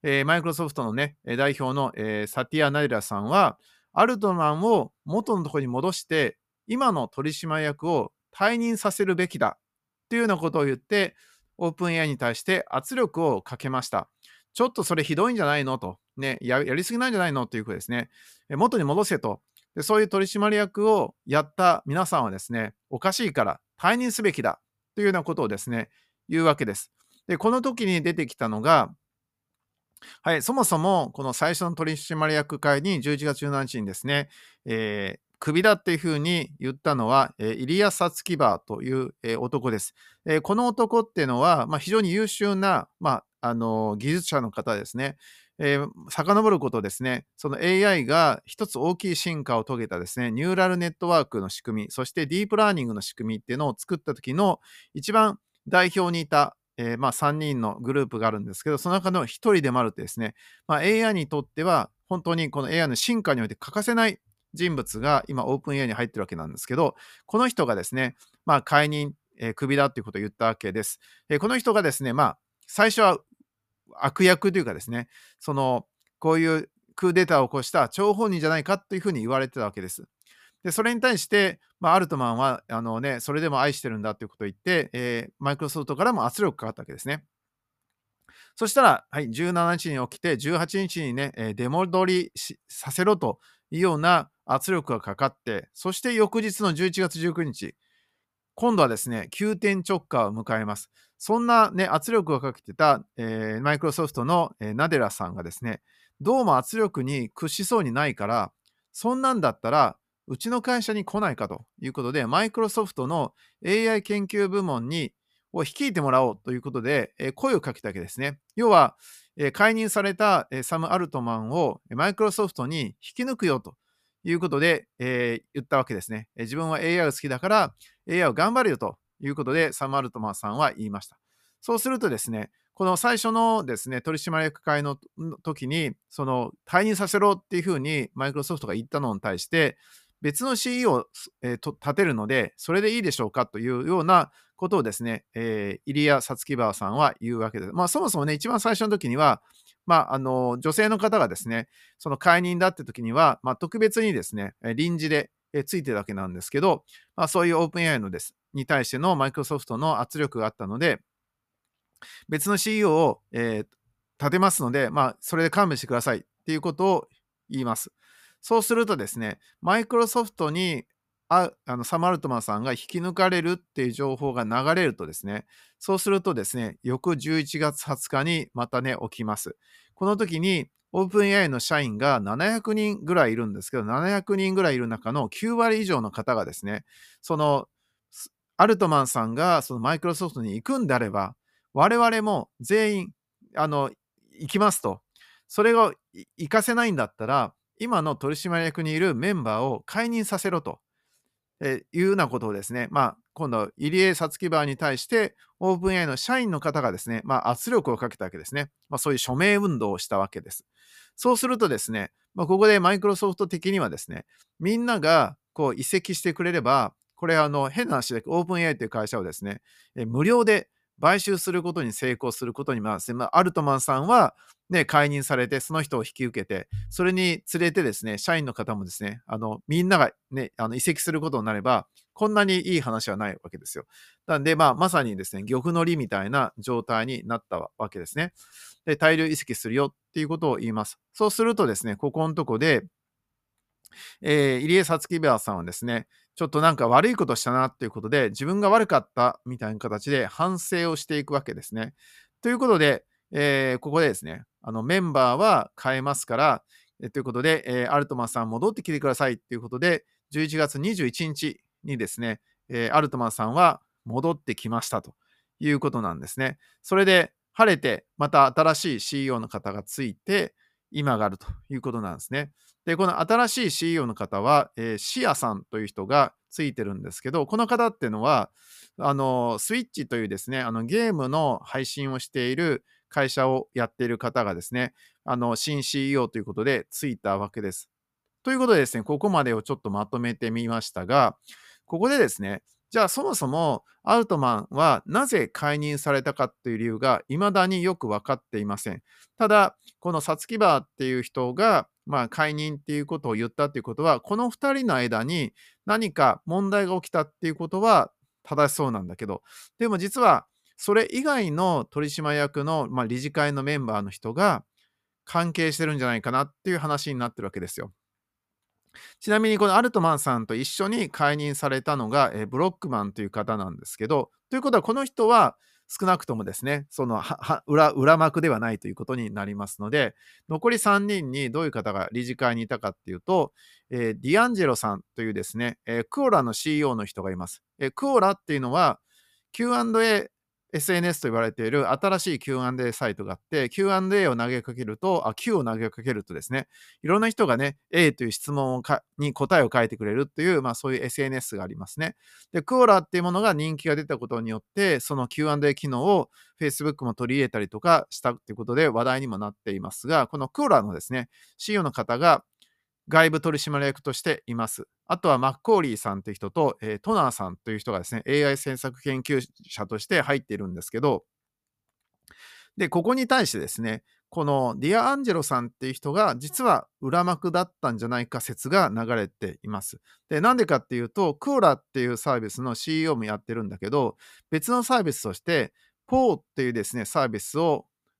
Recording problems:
none

